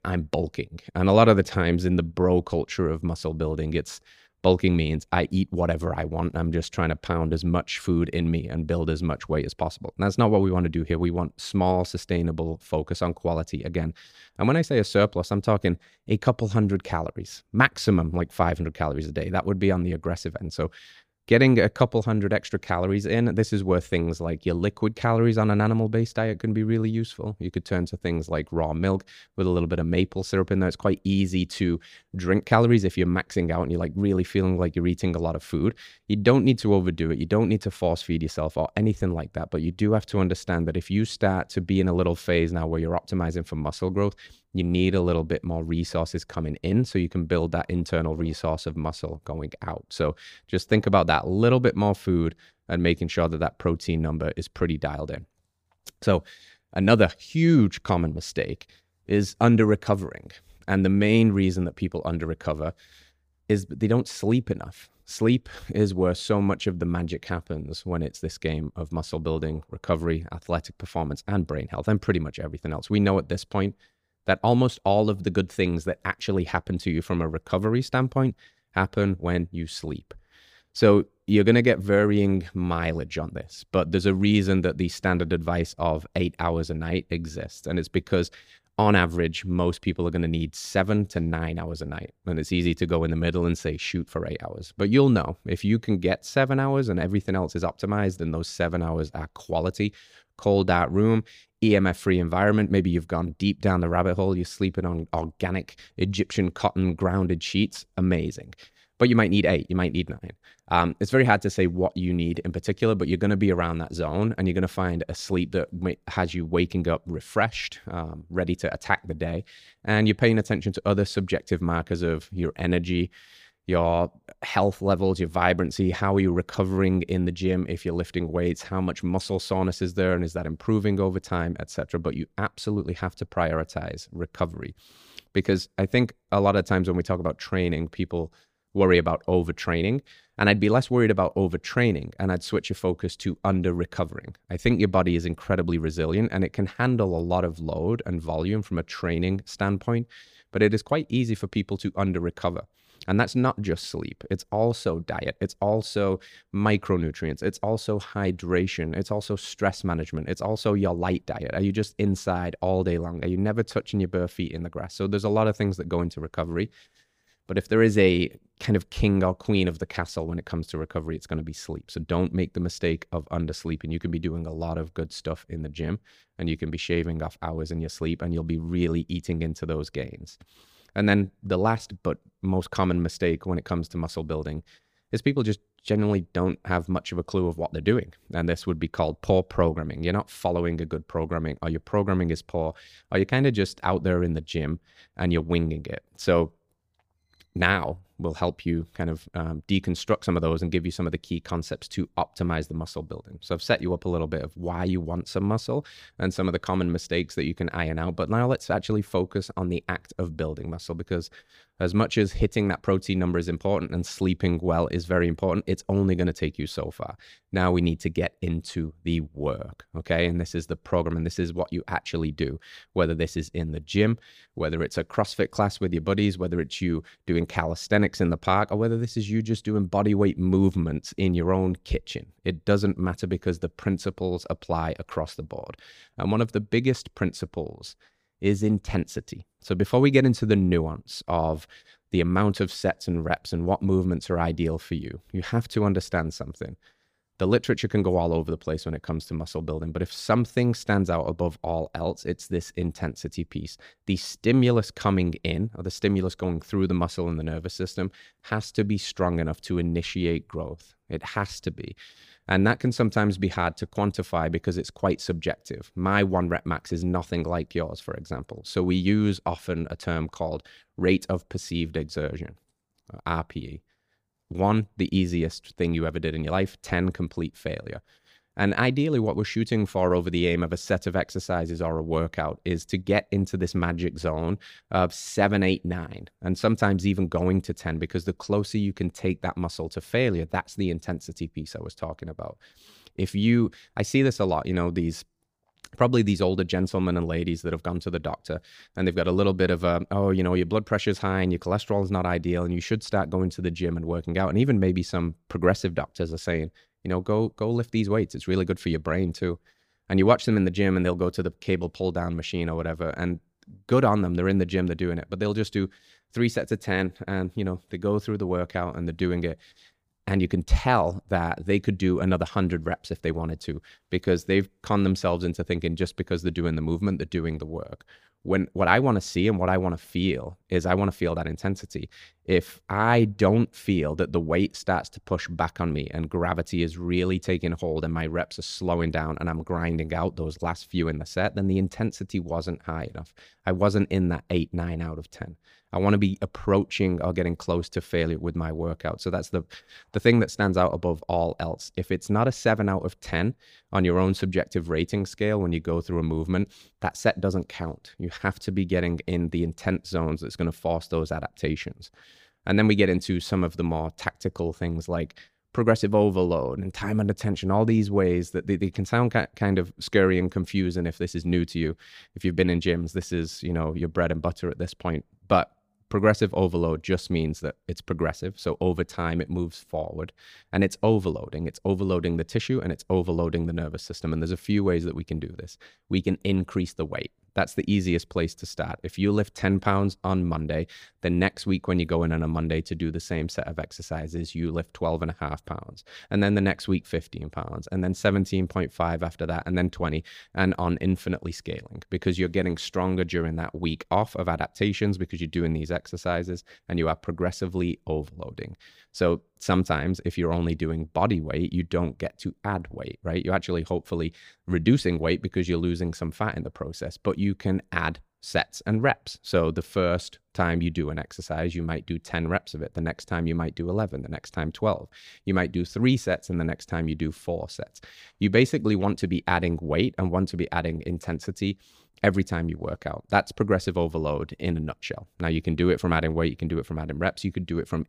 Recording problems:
none

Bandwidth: 15 kHz